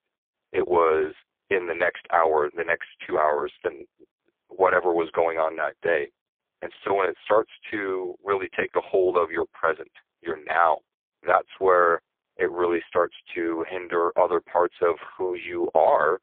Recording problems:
phone-call audio; poor line

